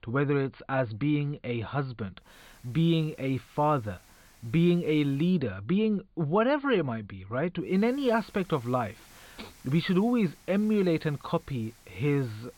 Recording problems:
high frequencies cut off; severe; nothing above 4.5 kHz
hiss; faint; from 2.5 to 5.5 s and from 7.5 s on; 25 dB below the speech

